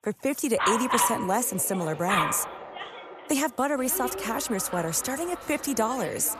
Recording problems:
echo of what is said; noticeable; throughout; 480 ms later, 15 dB below the speech
animal sounds; loud; throughout; 3 dB below the speech

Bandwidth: 14.5 kHz